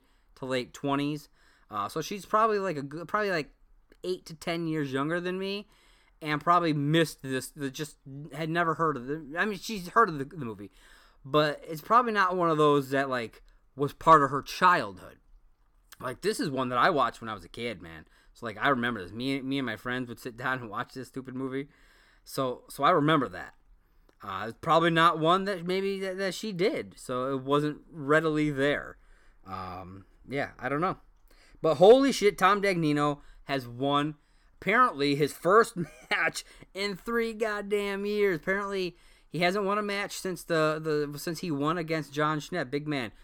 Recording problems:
none

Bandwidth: 17 kHz